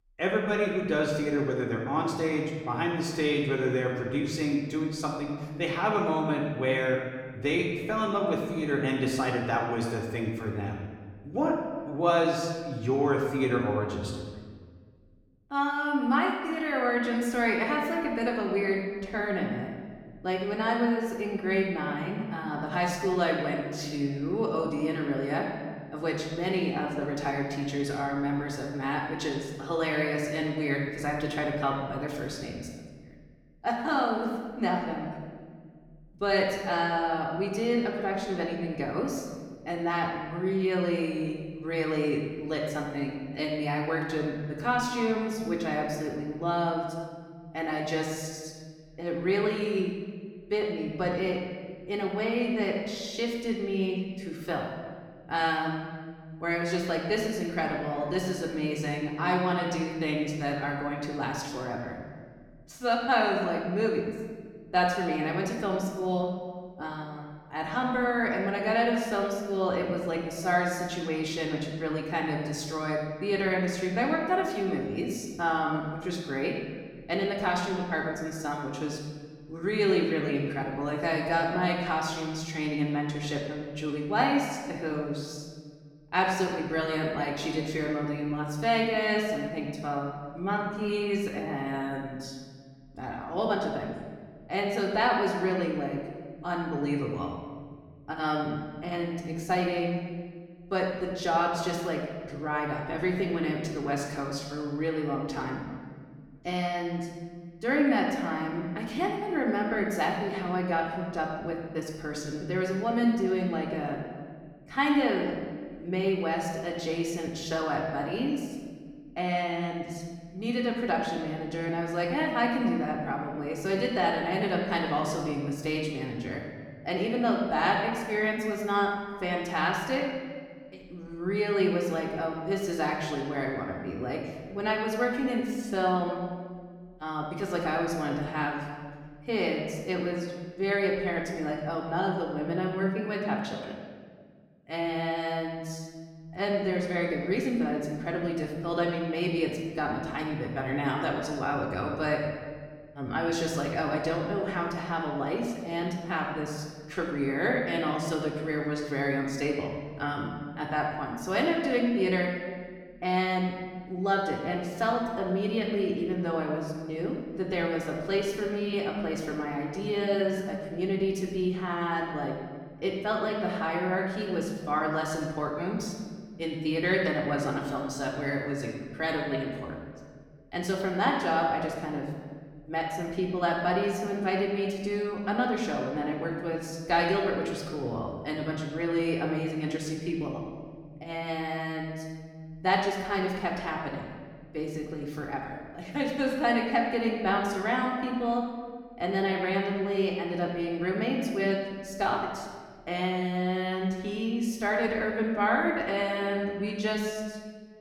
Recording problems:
off-mic speech; far
room echo; noticeable; dies away in 1.4 s

